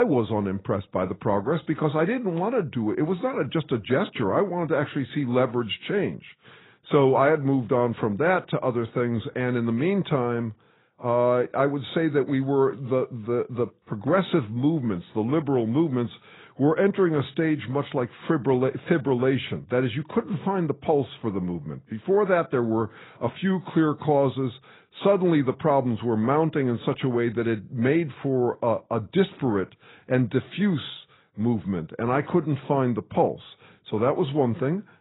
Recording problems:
garbled, watery; badly; nothing above 4 kHz
abrupt cut into speech; at the start

